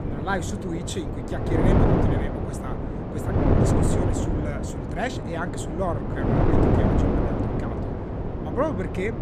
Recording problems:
wind noise on the microphone; heavy; 3 dB above the speech

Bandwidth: 14.5 kHz